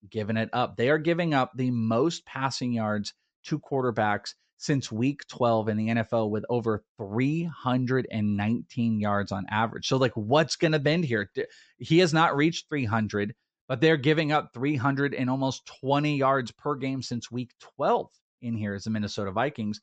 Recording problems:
high frequencies cut off; noticeable; nothing above 8 kHz

